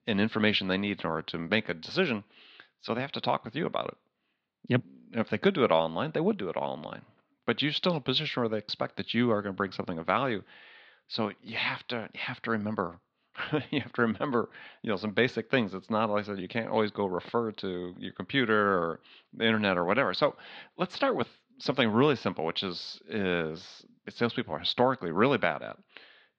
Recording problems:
muffled; very slightly; fading above 4 kHz

